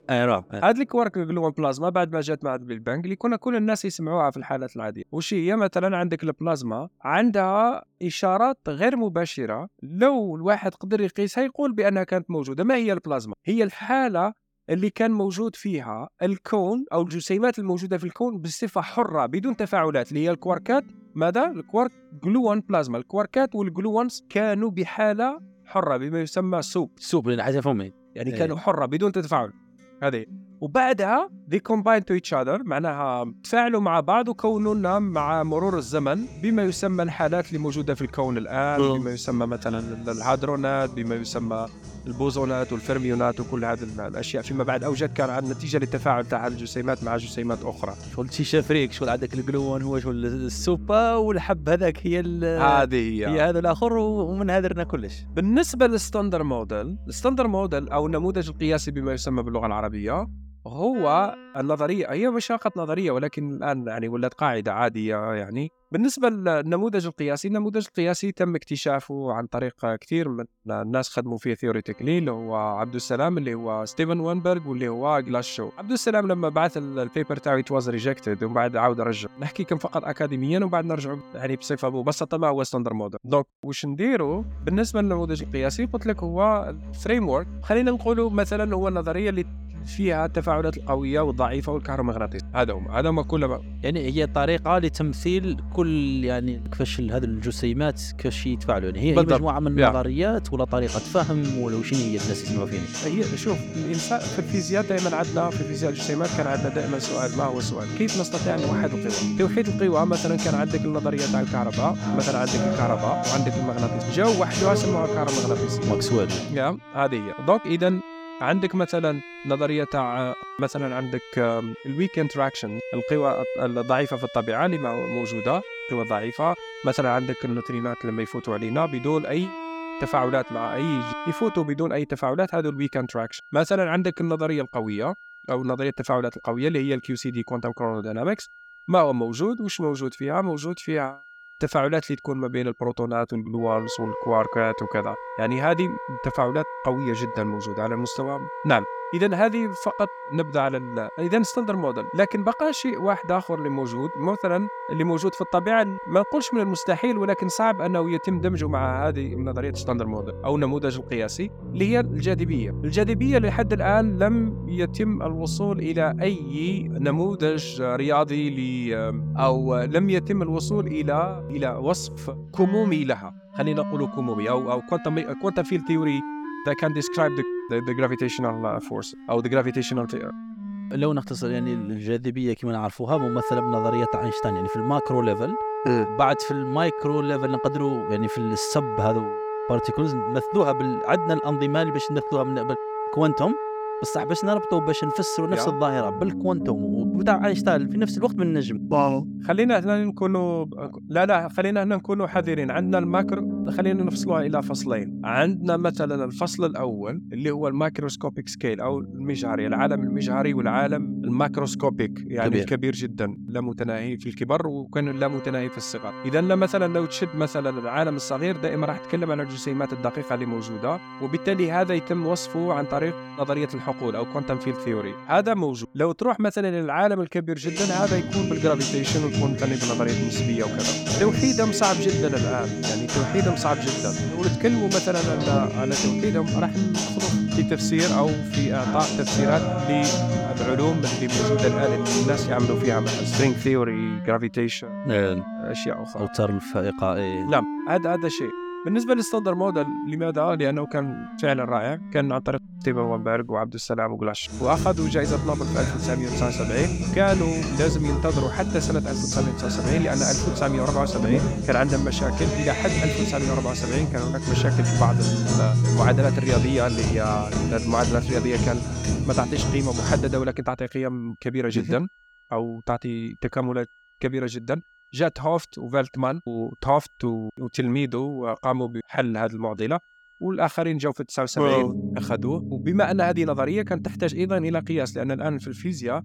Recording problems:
background music; loud; throughout; 5 dB below the speech

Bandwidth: 18 kHz